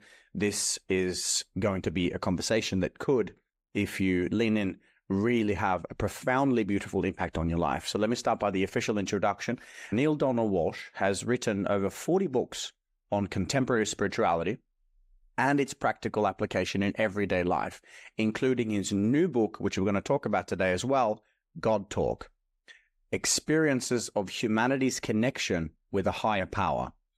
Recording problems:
none

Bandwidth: 15.5 kHz